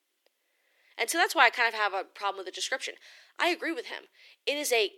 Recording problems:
thin; somewhat; fading below 350 Hz

